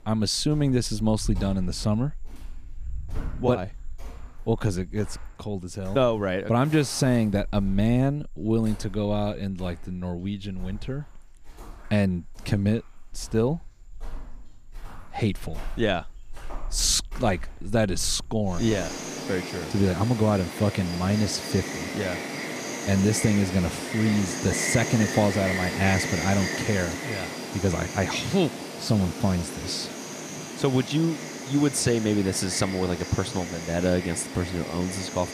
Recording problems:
animal sounds; loud; throughout; 8 dB below the speech

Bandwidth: 15 kHz